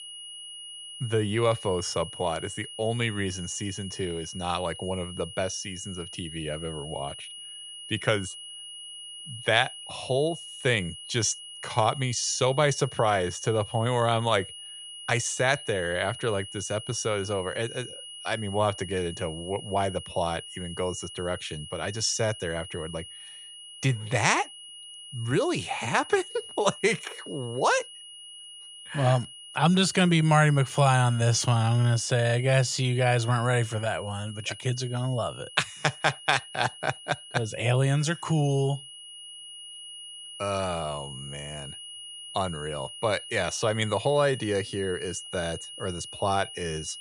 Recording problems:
high-pitched whine; noticeable; throughout; 3 kHz, 15 dB below the speech

